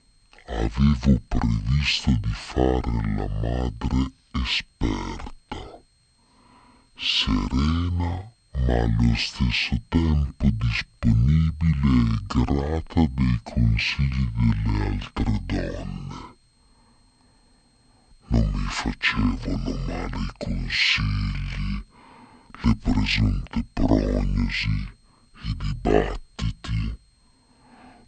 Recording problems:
wrong speed and pitch; too slow and too low; 0.5 times normal speed

